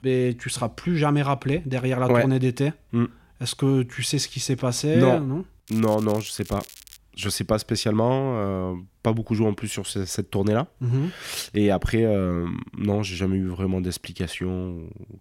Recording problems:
crackling; noticeable; from 5.5 to 7 s; 20 dB below the speech

